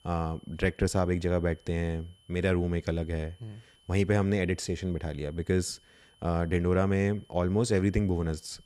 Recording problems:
high-pitched whine; faint; throughout; 3 kHz, 30 dB below the speech

